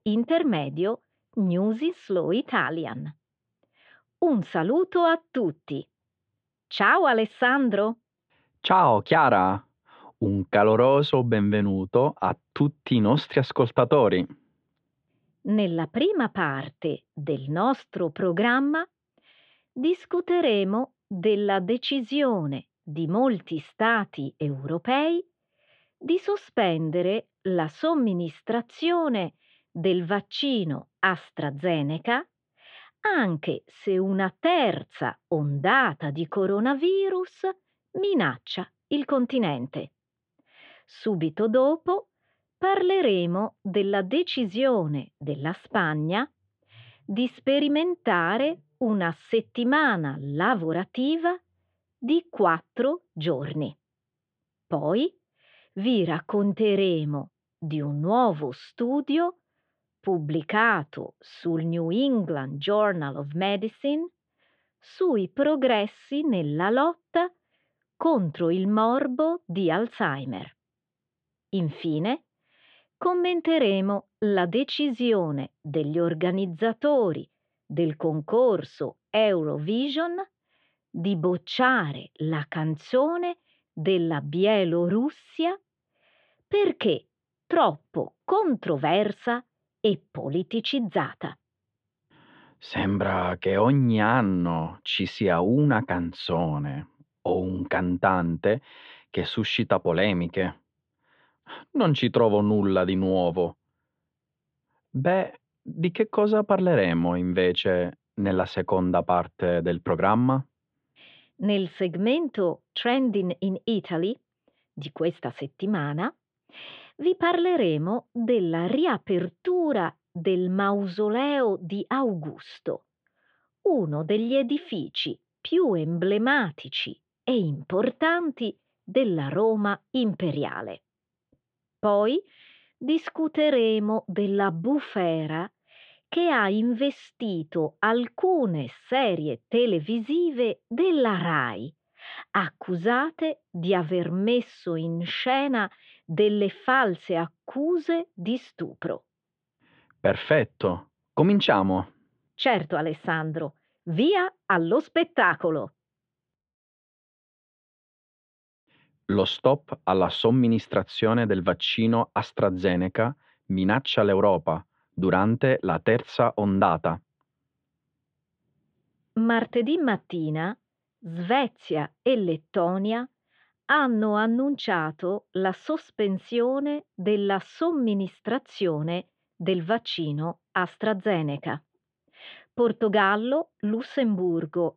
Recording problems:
muffled; very; fading above 3.5 kHz

